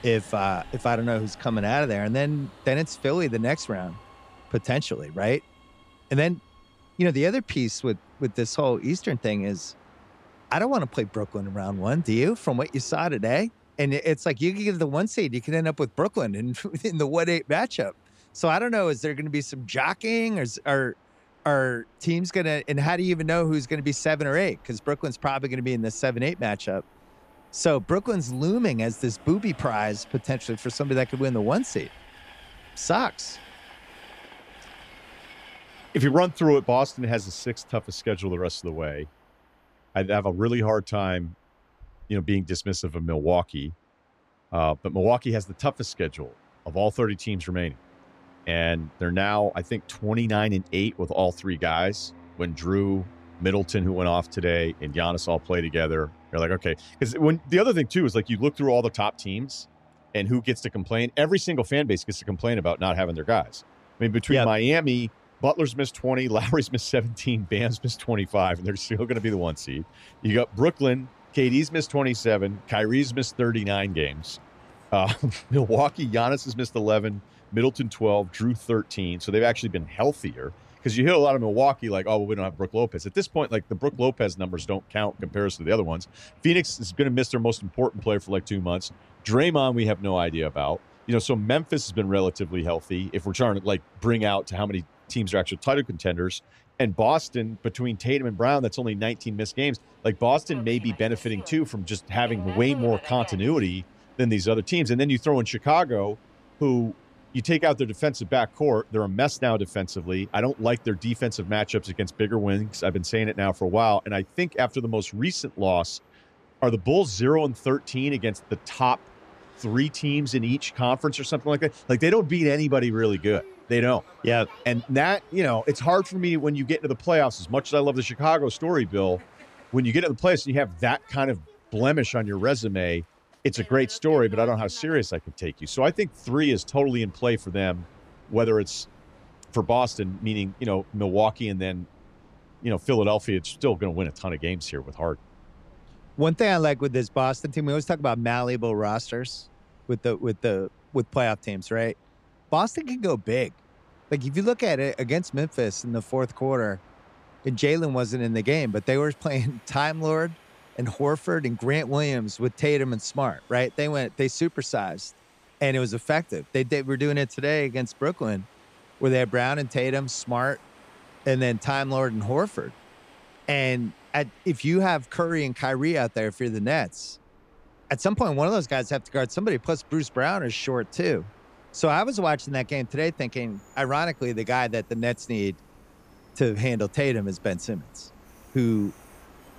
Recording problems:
train or aircraft noise; faint; throughout; 25 dB below the speech

